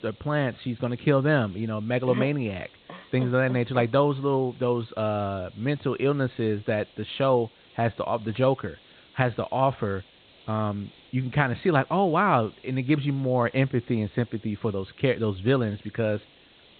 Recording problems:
high frequencies cut off; severe; nothing above 4 kHz
hiss; faint; throughout; 25 dB below the speech

